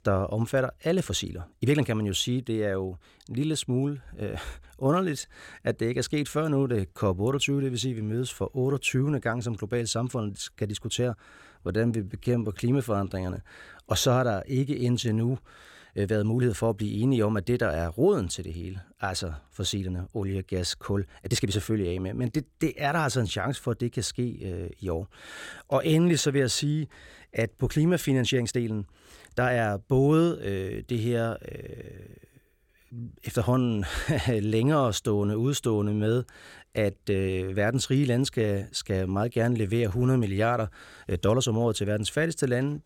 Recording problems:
uneven, jittery; strongly; from 1 to 42 s

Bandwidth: 16.5 kHz